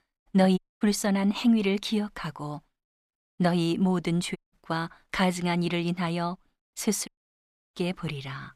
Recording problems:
audio cutting out; at 0.5 s, at 4.5 s and at 7 s for 0.5 s

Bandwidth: 14.5 kHz